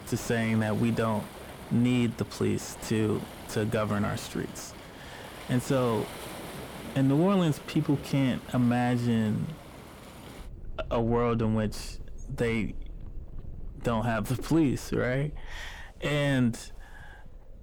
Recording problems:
distortion; slight; 10 dB below the speech
rain or running water; noticeable; throughout; 15 dB below the speech

